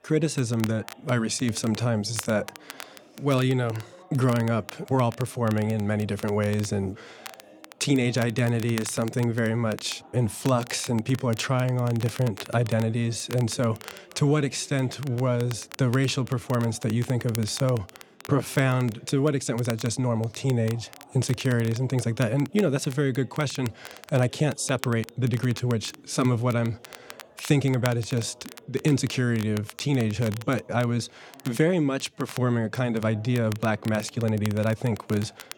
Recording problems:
crackle, like an old record; noticeable; 20 dB below the speech
background chatter; faint; throughout; 4 voices, 25 dB below the speech

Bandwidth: 17.5 kHz